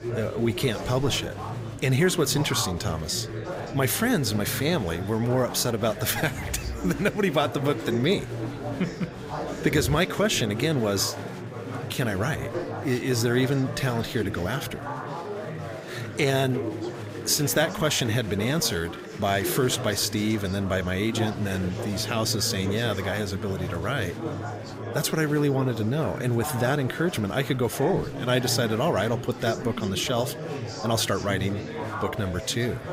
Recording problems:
murmuring crowd; loud; throughout; 8 dB below the speech

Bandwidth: 15.5 kHz